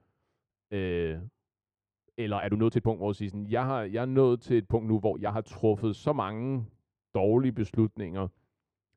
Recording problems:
muffled; slightly; fading above 2.5 kHz
uneven, jittery; strongly; from 0.5 to 8 s

